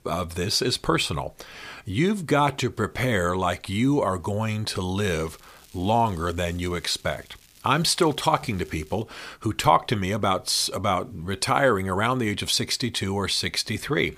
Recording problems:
crackling; faint; from 5 to 7.5 s and from 7.5 to 9 s; 25 dB below the speech

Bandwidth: 15 kHz